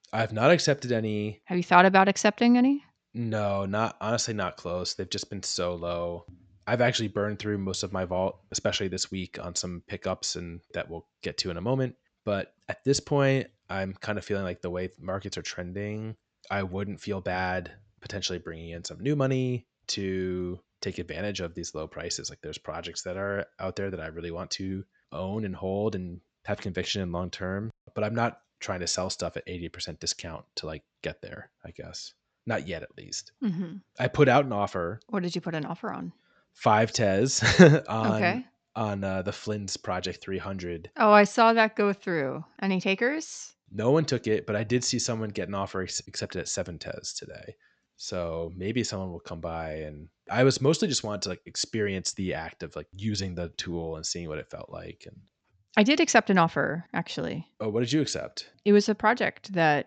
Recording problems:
high frequencies cut off; noticeable; nothing above 8 kHz

